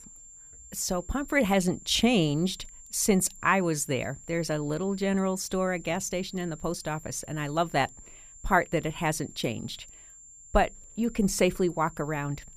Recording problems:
high-pitched whine; noticeable; throughout; 7.5 kHz, 20 dB below the speech

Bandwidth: 15 kHz